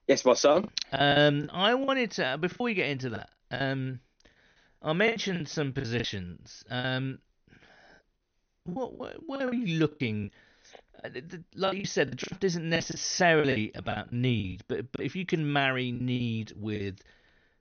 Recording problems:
high frequencies cut off; noticeable; nothing above 6.5 kHz
choppy; very; 12% of the speech affected

